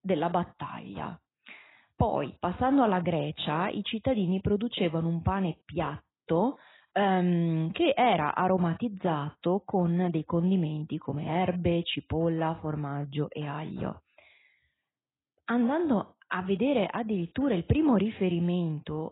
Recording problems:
garbled, watery; badly; nothing above 4 kHz

